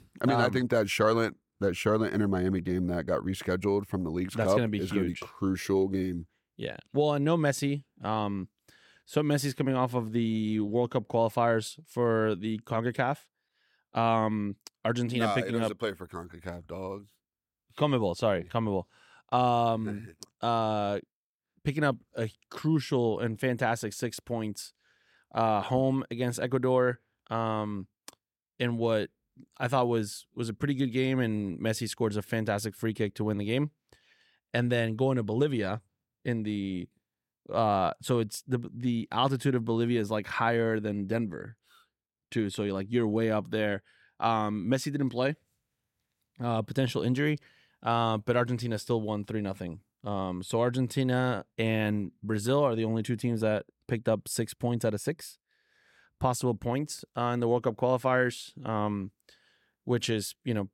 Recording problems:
none

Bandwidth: 16.5 kHz